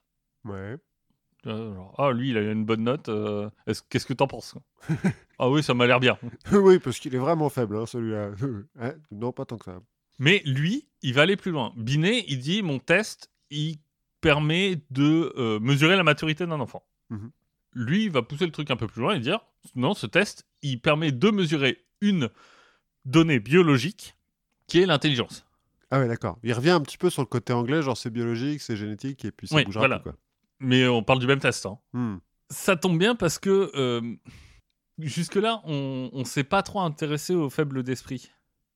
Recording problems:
none

